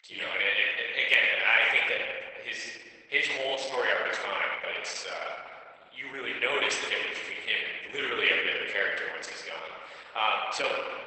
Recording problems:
garbled, watery; badly; nothing above 8 kHz
thin; very; fading below 600 Hz
room echo; noticeable; dies away in 1.7 s
off-mic speech; somewhat distant

